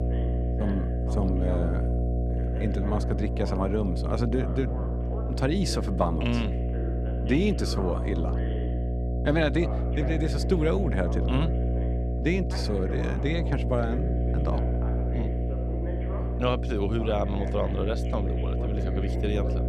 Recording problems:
electrical hum; loud; throughout; 60 Hz, 6 dB below the speech
voice in the background; noticeable; throughout; 15 dB below the speech

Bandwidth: 14 kHz